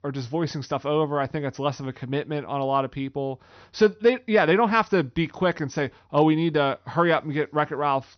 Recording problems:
high frequencies cut off; noticeable; nothing above 6 kHz

